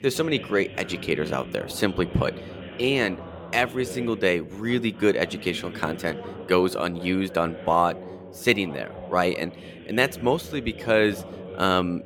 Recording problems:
background chatter; noticeable; throughout; 2 voices, 15 dB below the speech

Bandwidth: 17.5 kHz